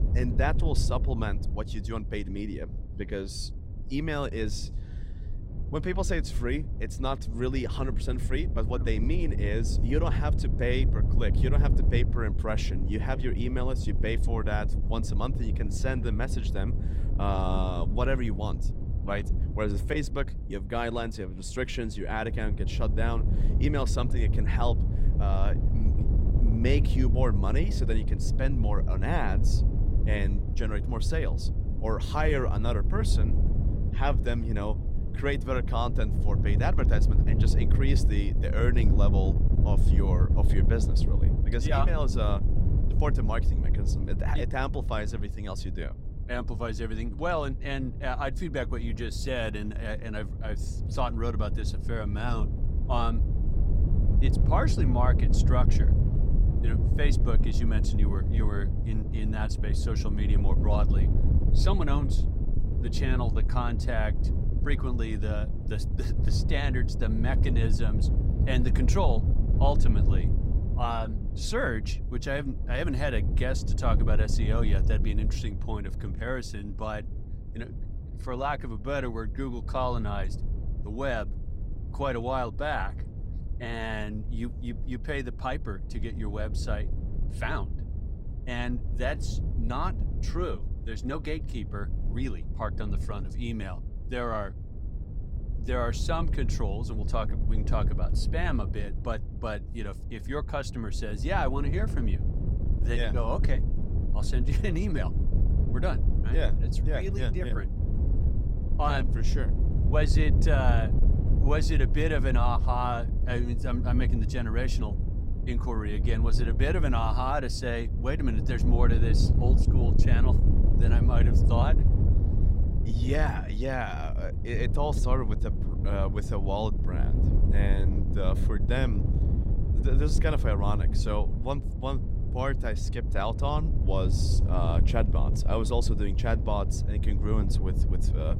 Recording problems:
wind noise on the microphone; heavy; 9 dB below the speech

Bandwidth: 16.5 kHz